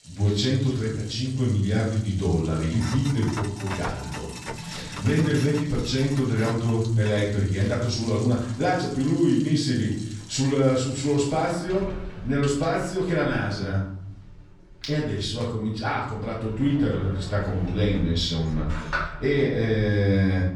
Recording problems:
off-mic speech; far
room echo; noticeable; dies away in 0.8 s
household noises; noticeable; throughout; 15 dB below the speech

